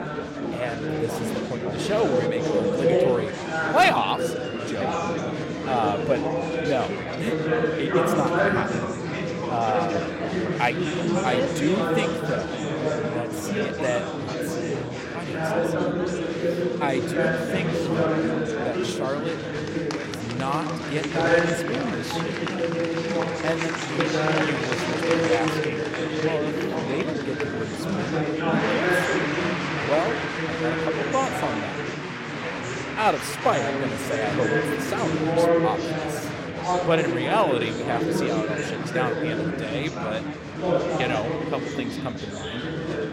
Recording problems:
chatter from many people; very loud; throughout; 3 dB above the speech
siren; noticeable; from 3.5 to 8 s; peak 10 dB below the speech

